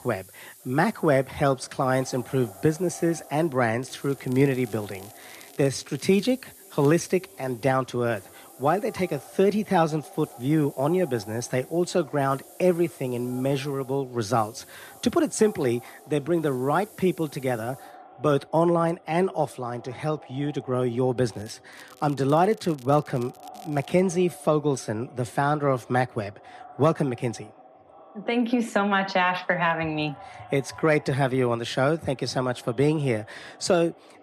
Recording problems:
echo of what is said; faint; throughout; 500 ms later, 25 dB below the speech
hiss; faint; until 18 s; 25 dB below the speech
crackling; very faint; from 4 to 6.5 s, at 21 s and from 22 to 24 s; 25 dB below the speech

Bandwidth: 14.5 kHz